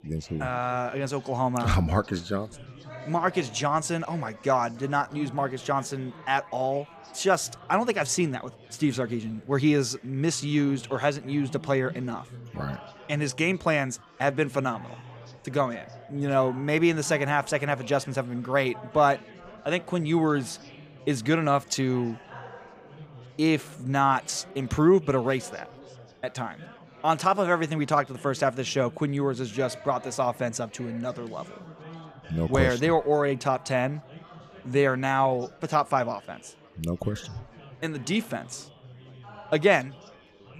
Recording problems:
chatter from many people; faint; throughout; 20 dB below the speech

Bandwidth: 15 kHz